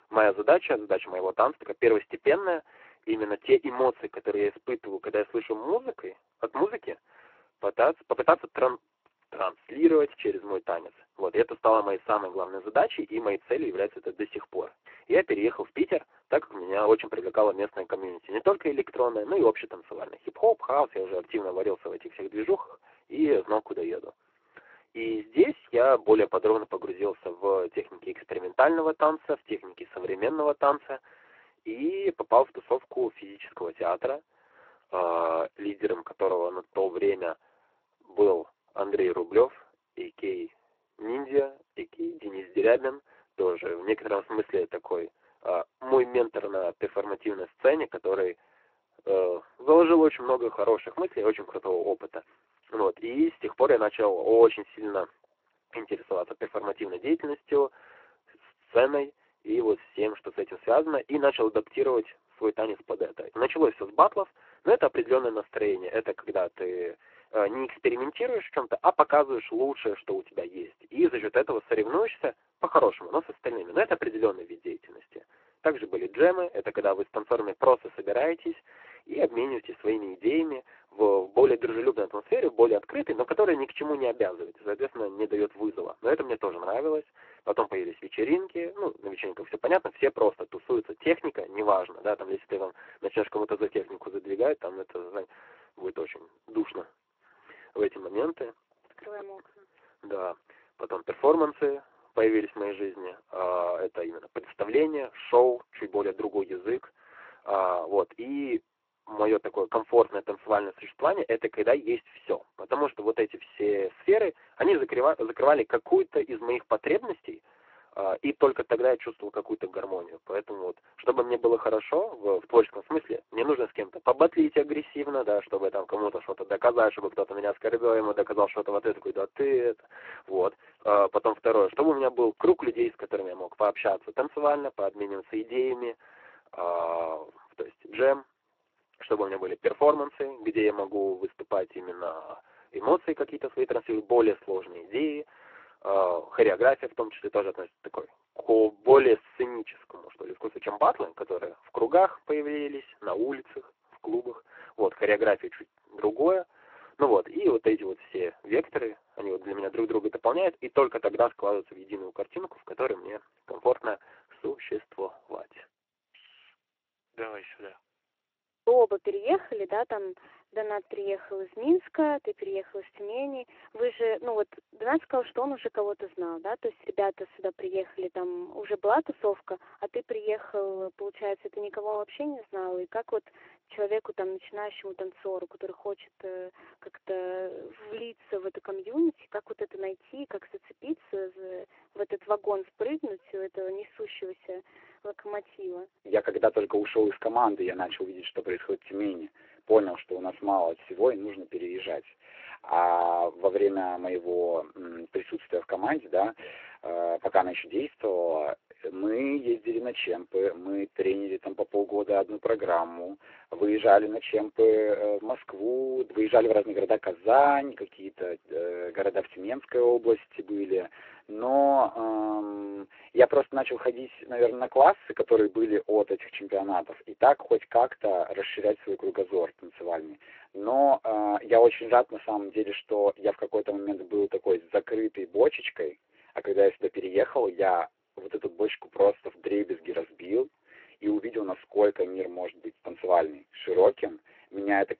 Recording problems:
phone-call audio
garbled, watery; slightly

